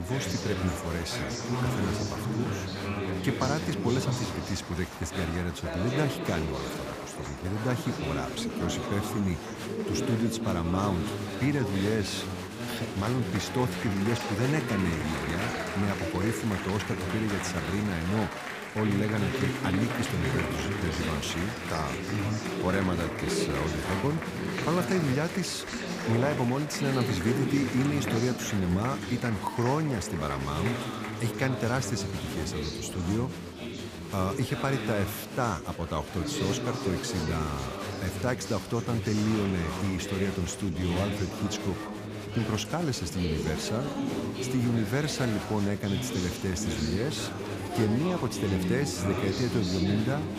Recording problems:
echo of what is said; faint; throughout; 410 ms later, 20 dB below the speech
chatter from many people; loud; throughout; 2 dB below the speech
abrupt cut into speech; at the start

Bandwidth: 15 kHz